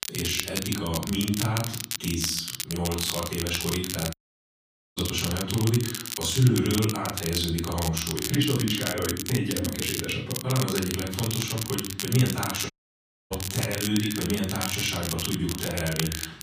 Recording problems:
off-mic speech; far
room echo; noticeable; dies away in 0.5 s
echo of what is said; faint; from 11 s on; 150 ms later, 20 dB below the speech
crackle, like an old record; loud; 4 dB below the speech
audio cutting out; at 4 s for 1 s and at 13 s for 0.5 s

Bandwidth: 15 kHz